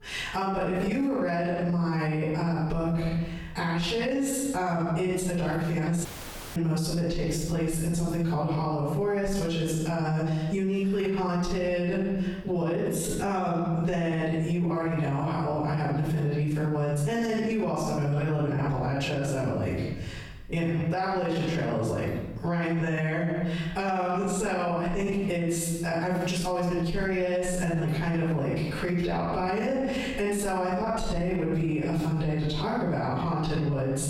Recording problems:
room echo; strong; dies away in 0.8 s
off-mic speech; far
squashed, flat; heavily
audio cutting out; at 6 s for 0.5 s

